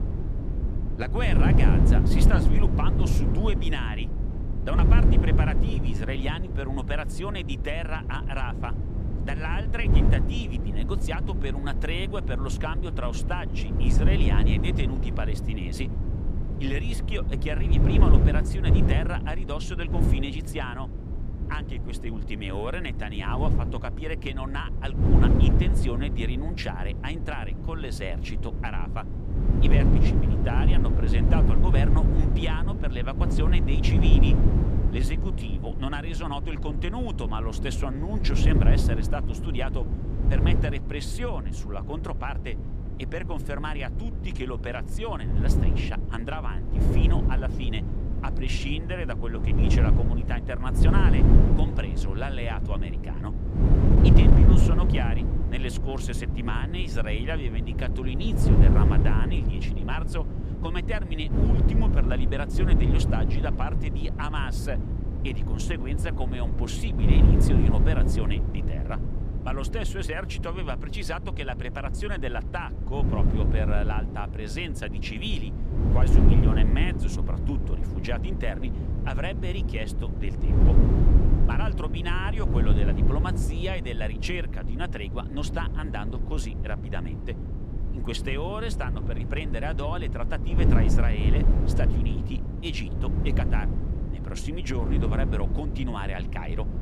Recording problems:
wind noise on the microphone; heavy; 2 dB below the speech

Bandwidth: 14.5 kHz